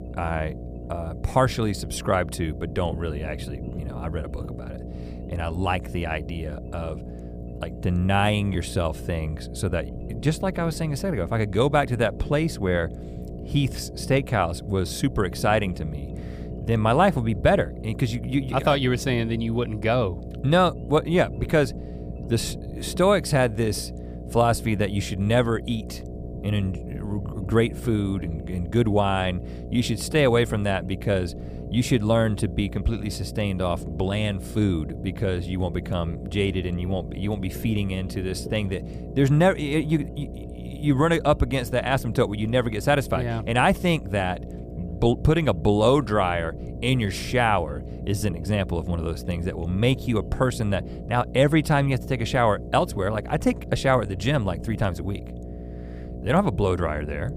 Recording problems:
electrical hum; noticeable; throughout; 60 Hz, 20 dB below the speech
low rumble; faint; throughout; 20 dB below the speech

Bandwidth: 15 kHz